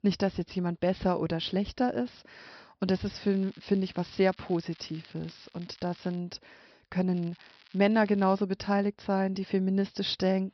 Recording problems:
high frequencies cut off; noticeable; nothing above 5.5 kHz
crackling; faint; from 3 to 6 s and from 7 to 8.5 s; 25 dB below the speech

